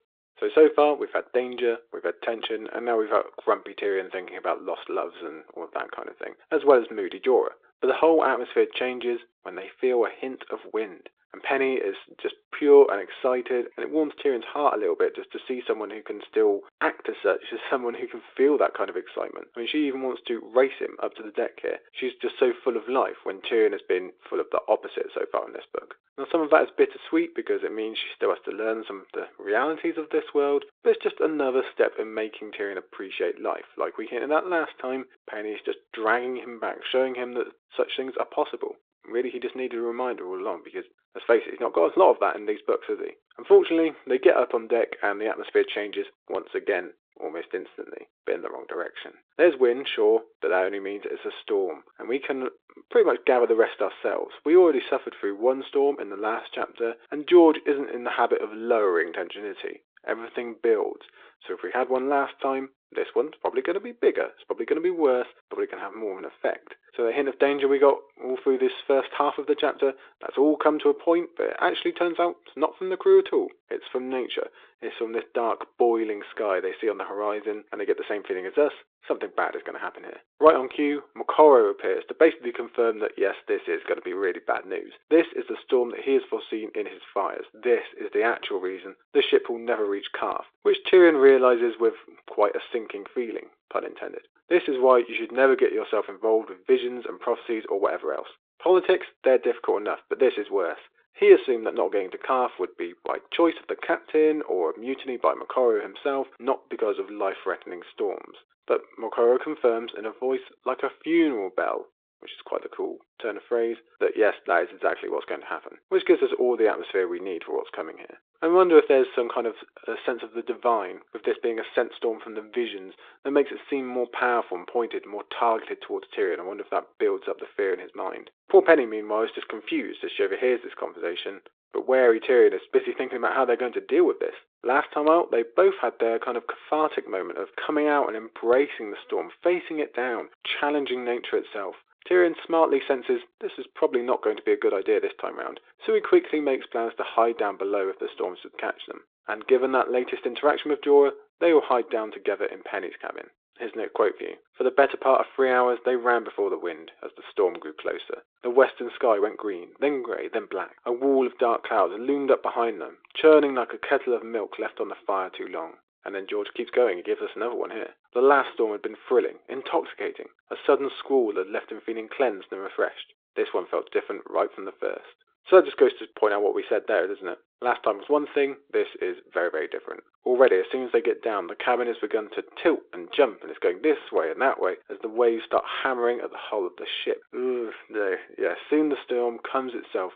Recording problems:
phone-call audio

